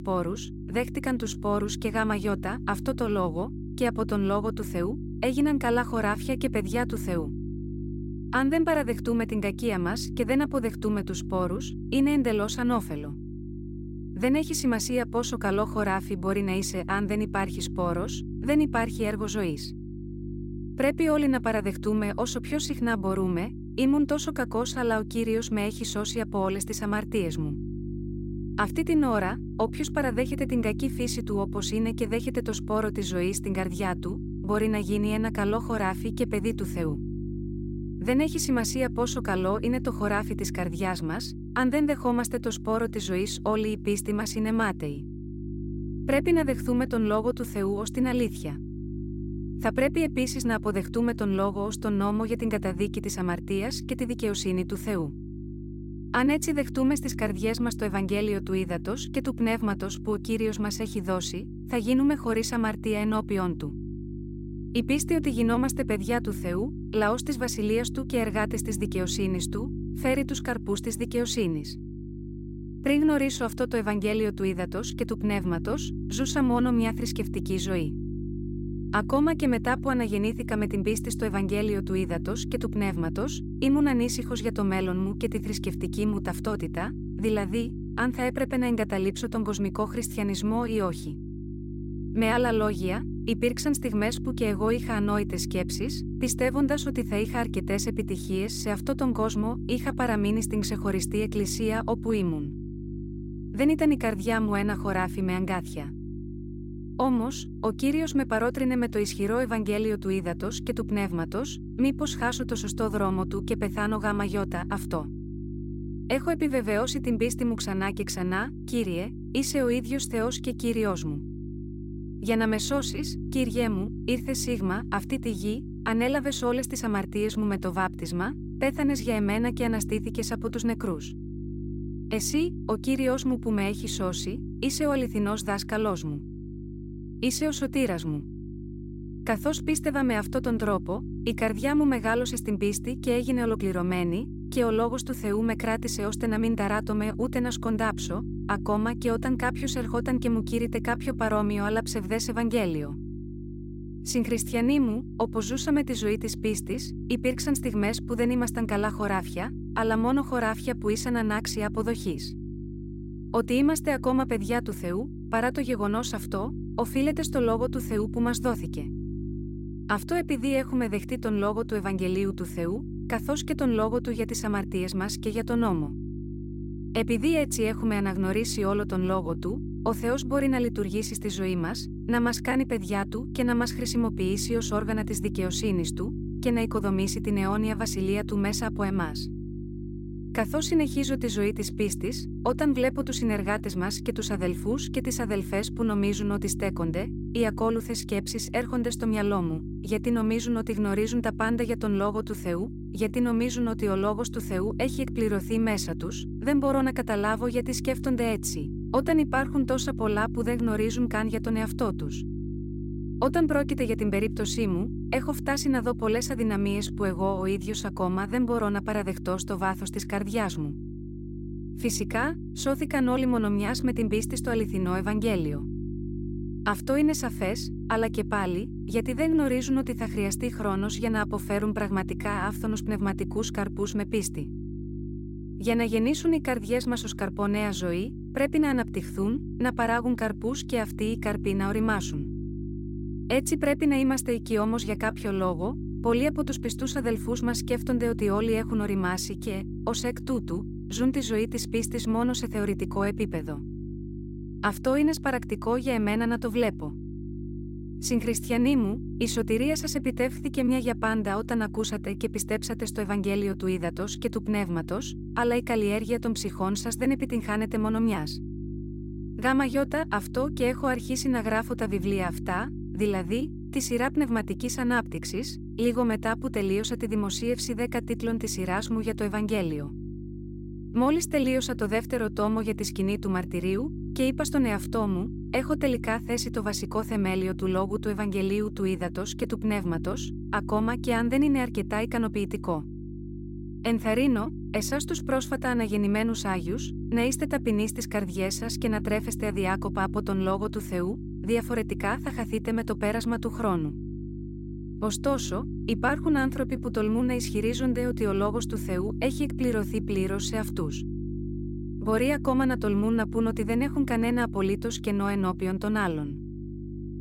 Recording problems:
electrical hum; noticeable; throughout; 50 Hz, 15 dB below the speech

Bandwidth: 16 kHz